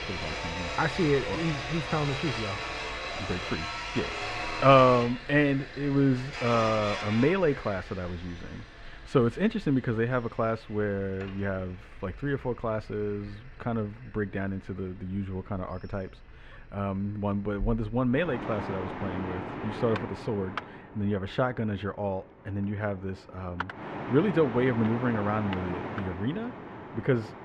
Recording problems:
muffled; very; fading above 2 kHz
machinery noise; loud; throughout; 7 dB below the speech

